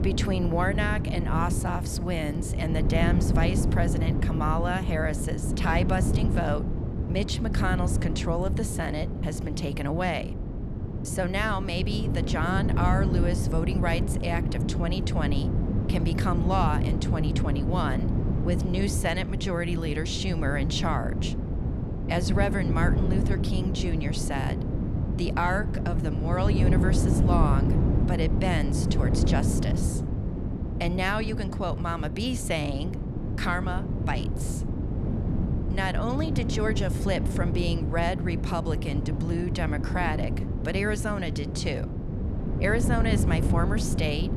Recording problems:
wind noise on the microphone; heavy; 6 dB below the speech

